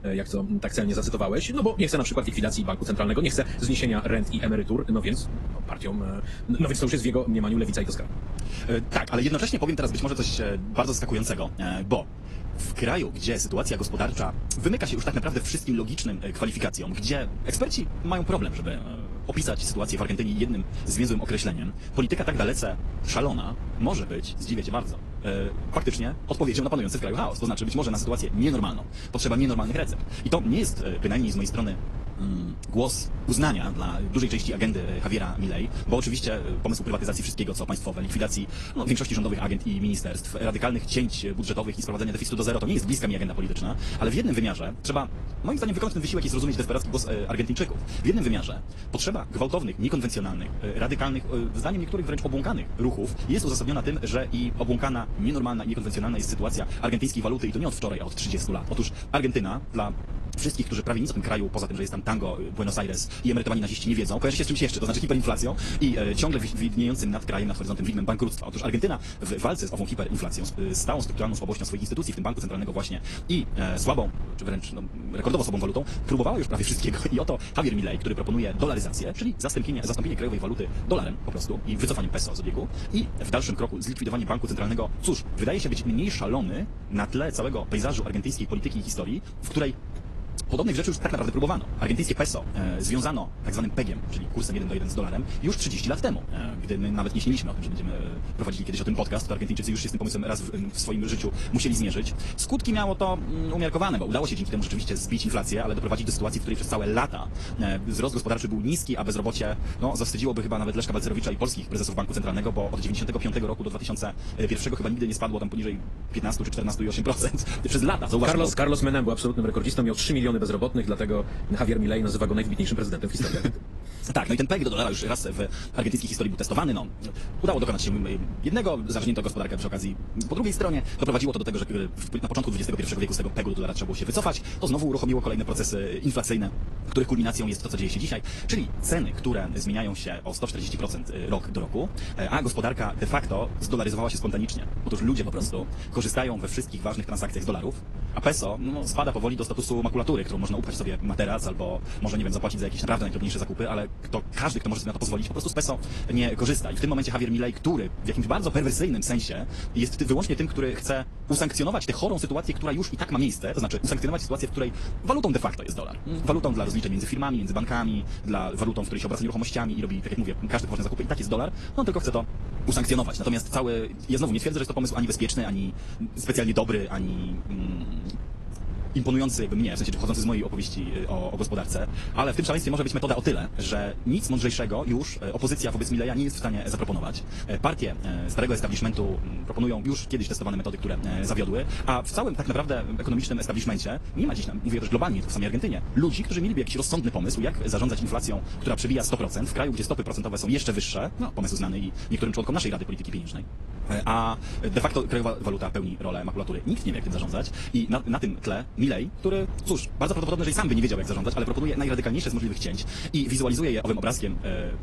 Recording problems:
wrong speed, natural pitch; too fast; 1.6 times normal speed
garbled, watery; slightly; nothing above 11.5 kHz
wind noise on the microphone; occasional gusts; 15 dB below the speech

